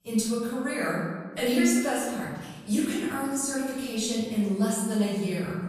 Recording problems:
room echo; strong; dies away in 1.3 s
off-mic speech; far

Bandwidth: 14.5 kHz